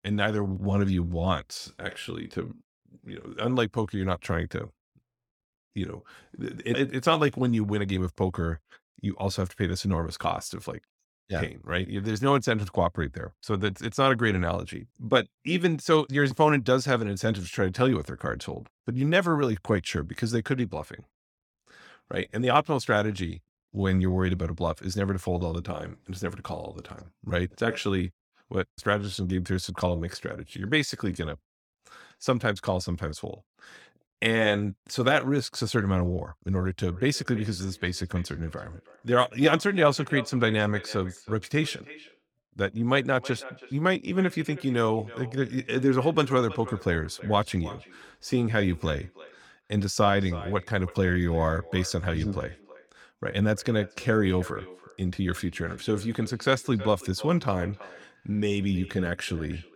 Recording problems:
echo of what is said; noticeable; from 37 s on; 320 ms later, 20 dB below the speech

